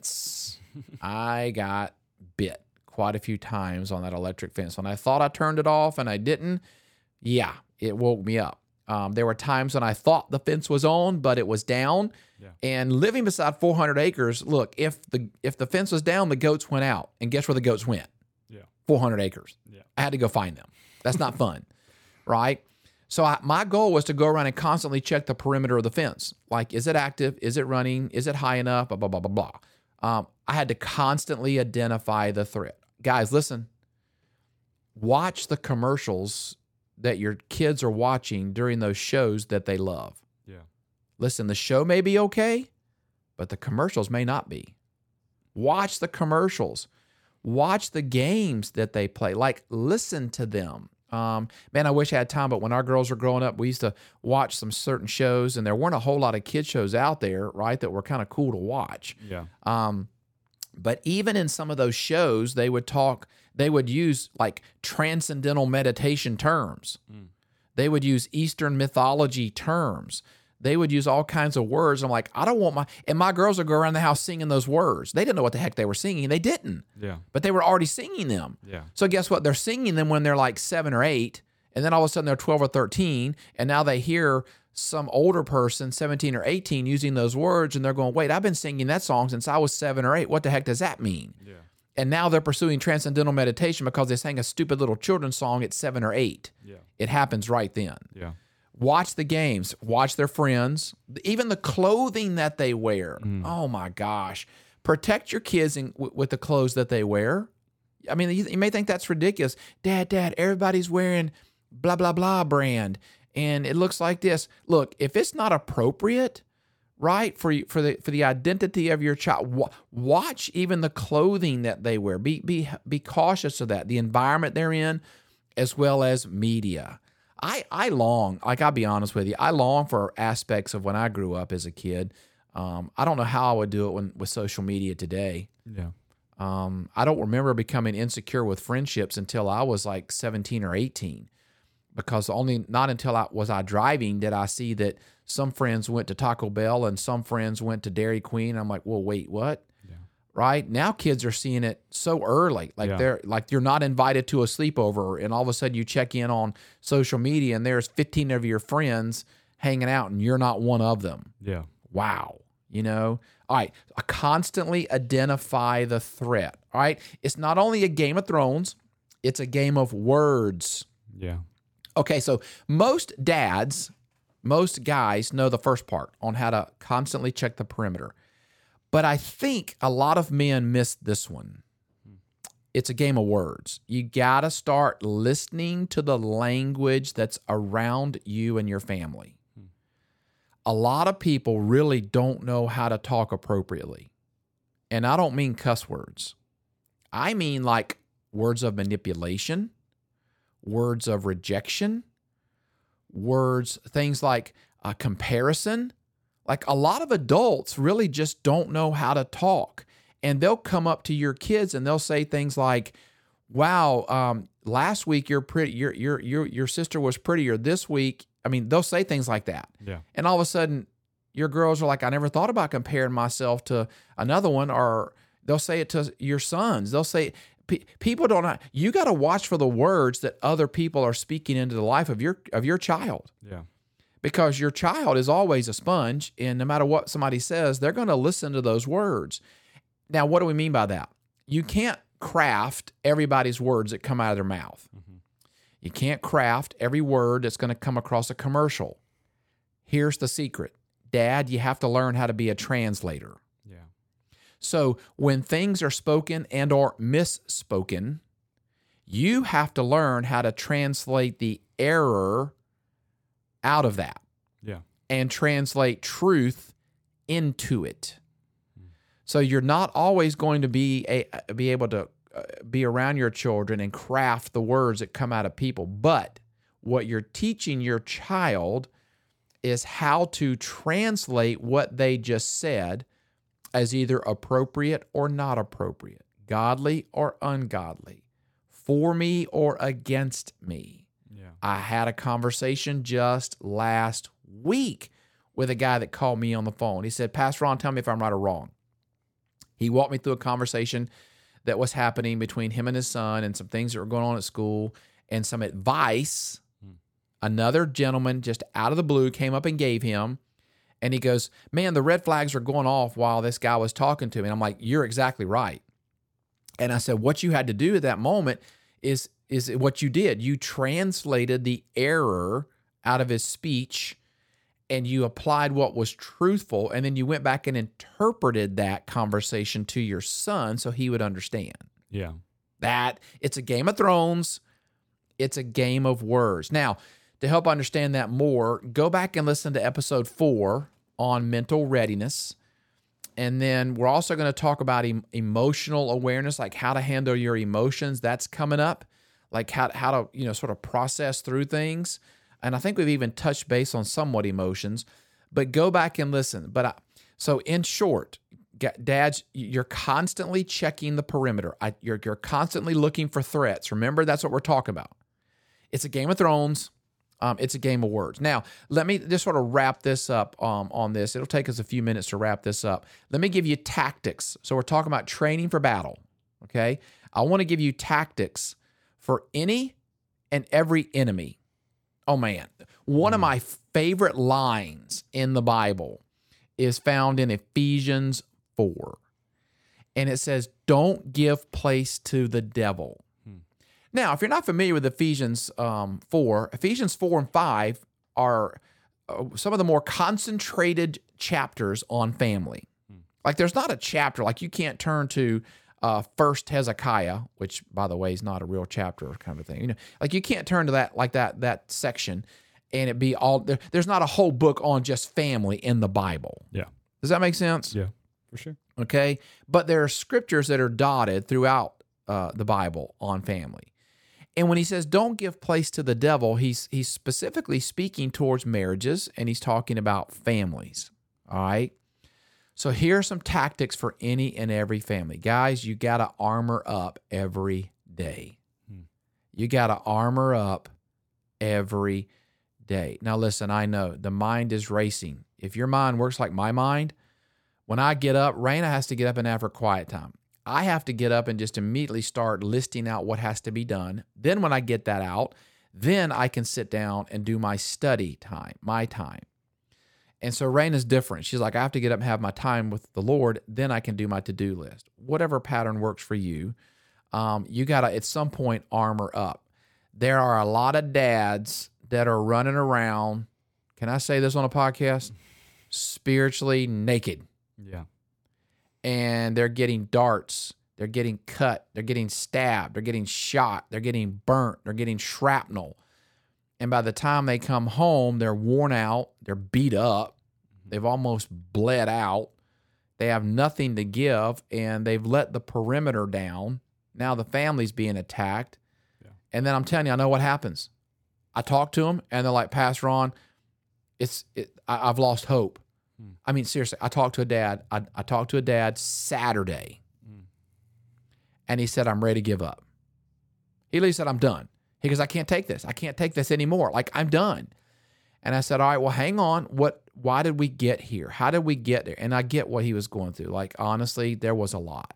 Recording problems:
none

